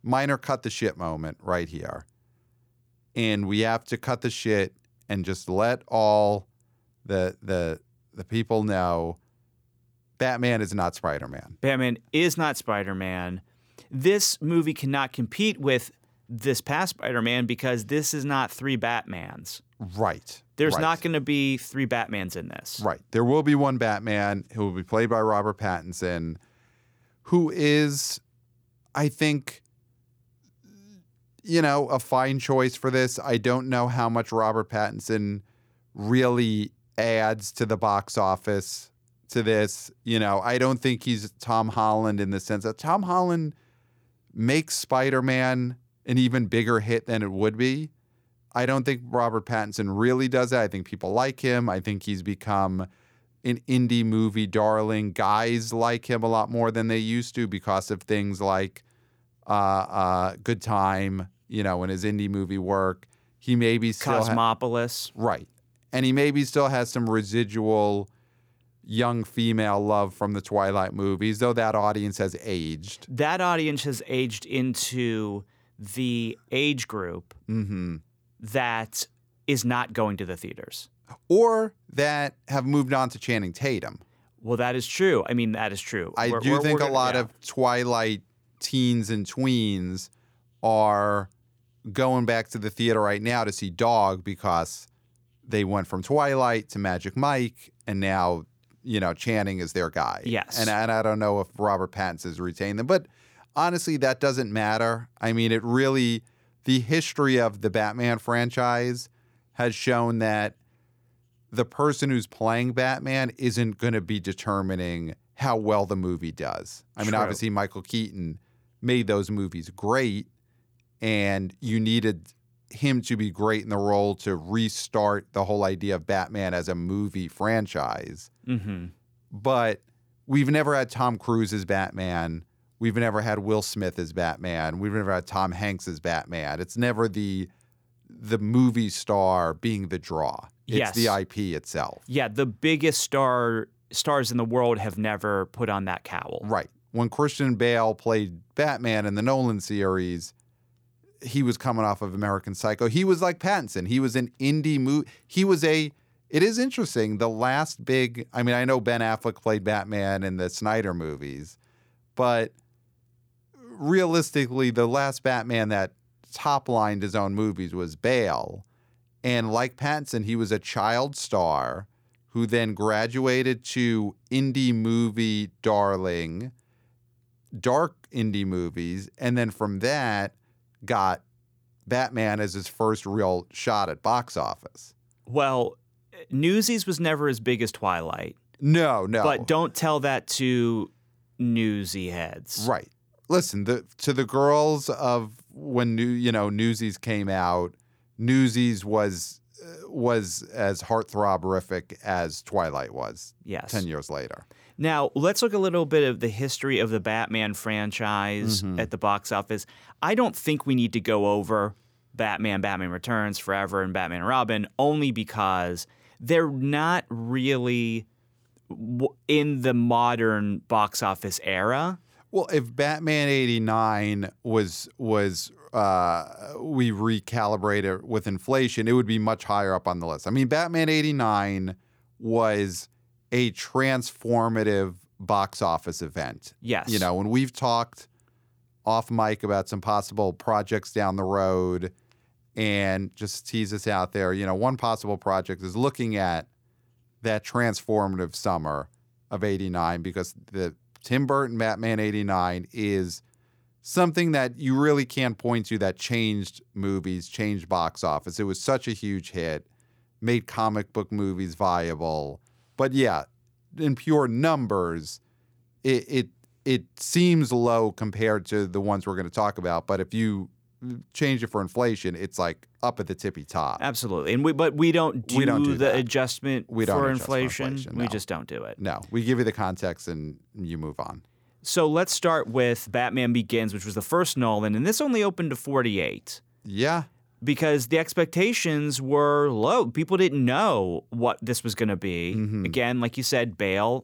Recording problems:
none

